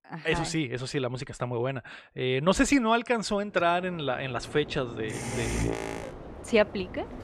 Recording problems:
train or aircraft noise; loud; from 4 s on; 8 dB below the speech

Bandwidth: 14 kHz